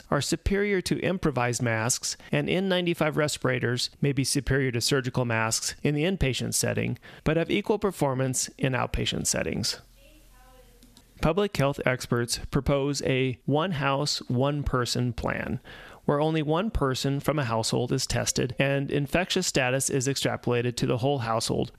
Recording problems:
squashed, flat; somewhat

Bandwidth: 14.5 kHz